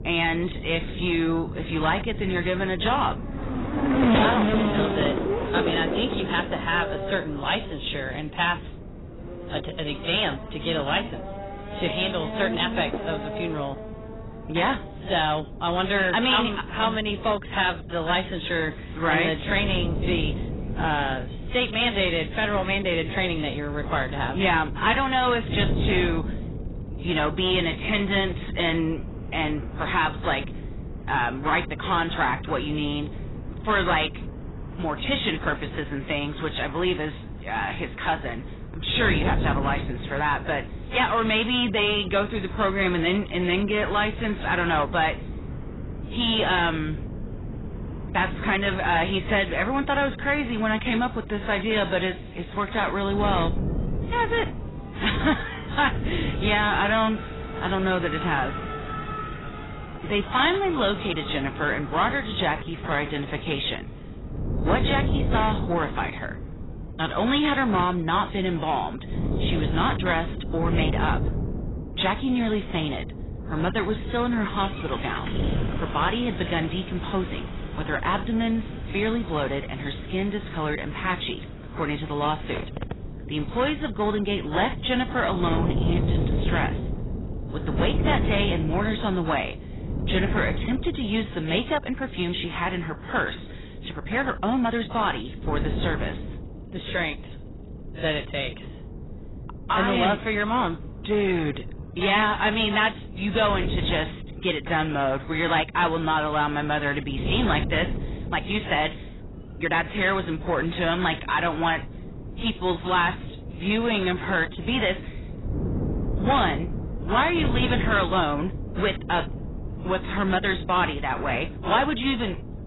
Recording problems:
garbled, watery; badly; nothing above 4 kHz
distortion; slight; 10 dB below the speech
traffic noise; loud; throughout; 8 dB below the speech
wind noise on the microphone; occasional gusts; 15 dB below the speech
uneven, jittery; strongly; from 5.5 s to 1:55

